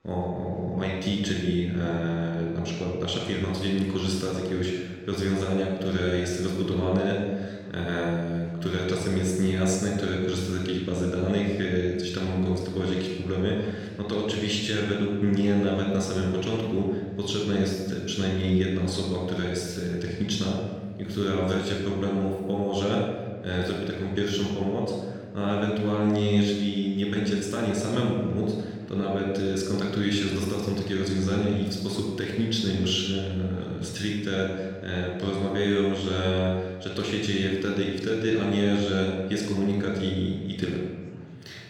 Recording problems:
room echo; noticeable; dies away in 1.4 s
off-mic speech; somewhat distant
murmuring crowd; faint; throughout; 30 dB below the speech

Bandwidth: 17.5 kHz